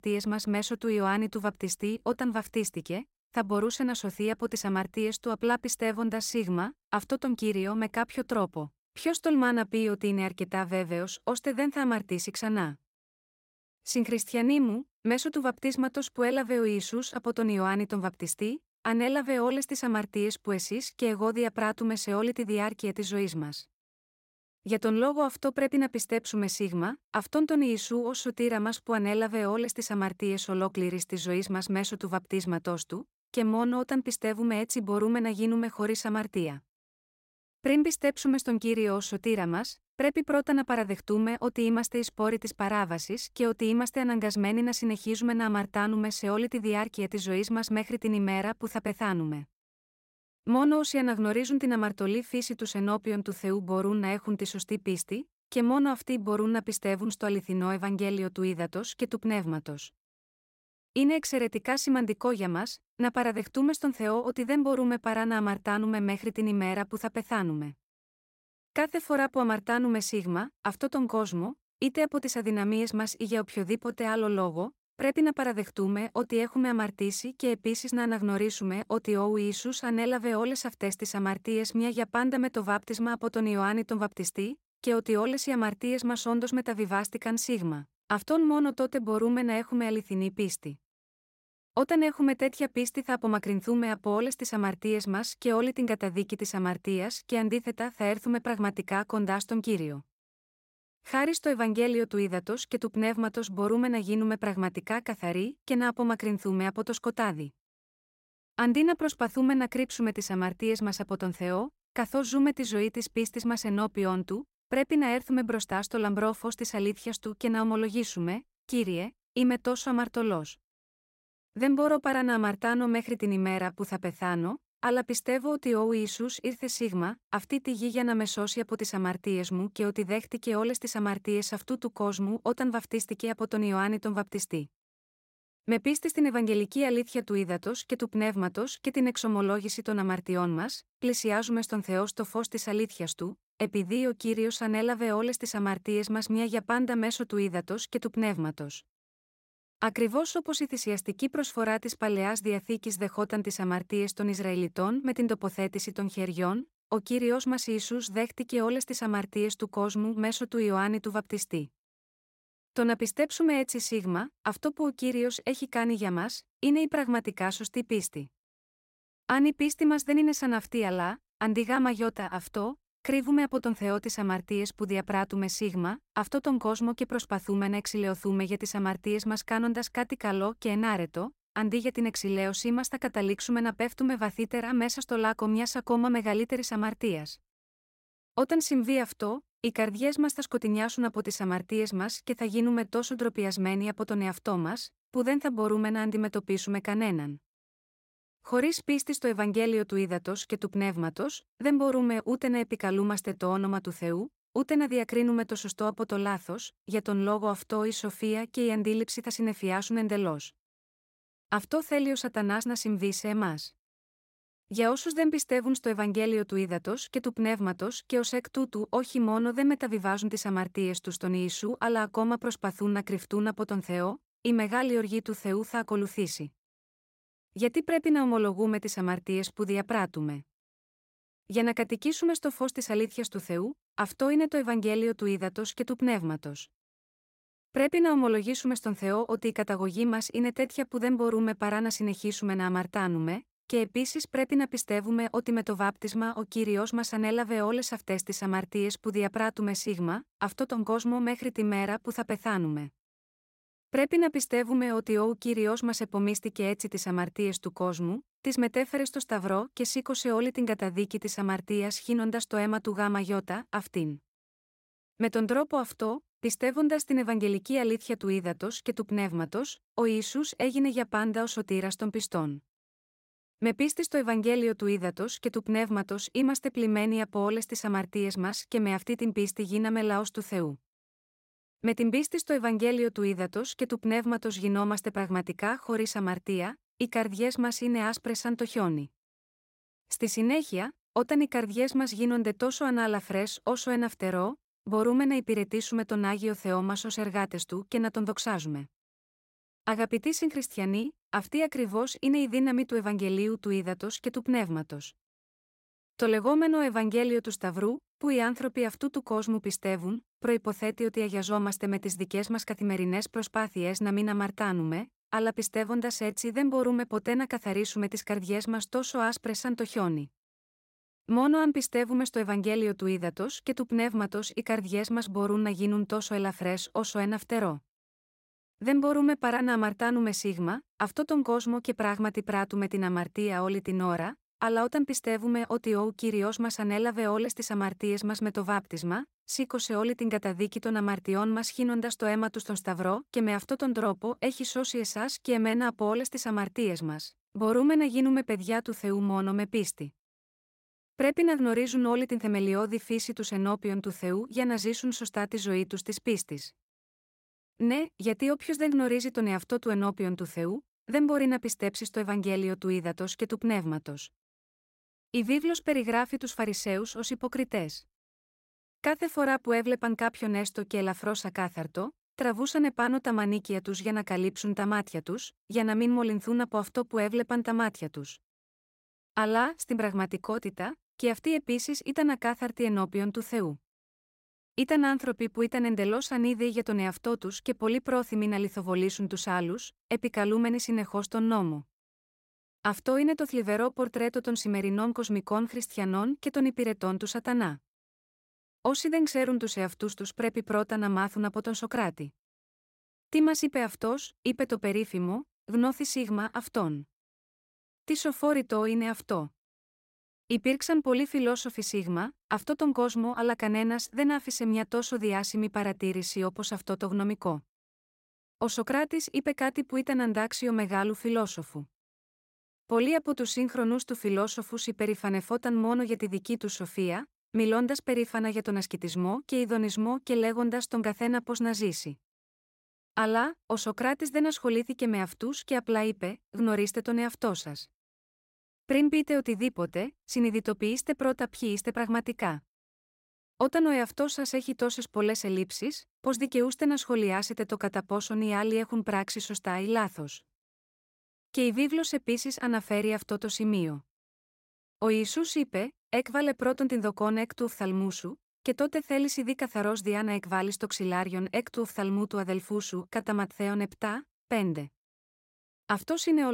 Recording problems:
abrupt cut into speech; at the end

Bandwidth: 16 kHz